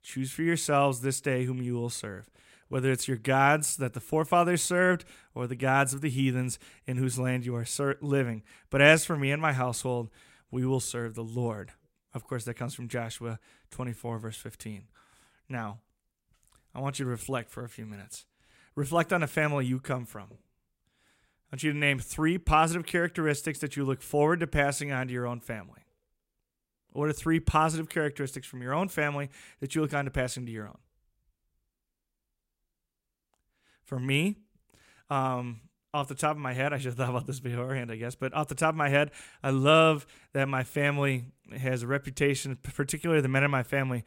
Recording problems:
none

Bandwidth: 16 kHz